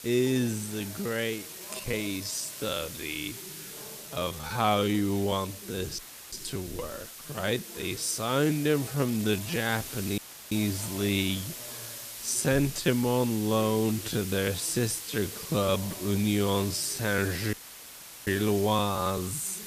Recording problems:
wrong speed, natural pitch; too slow; 0.5 times normal speed
hiss; loud; throughout; 10 dB below the speech
background chatter; faint; throughout; 3 voices, 20 dB below the speech
uneven, jittery; strongly; from 1 to 9.5 s
audio cutting out; filled with static; at 6 s, at 10 s and at 18 s for 0.5 s

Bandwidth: 14.5 kHz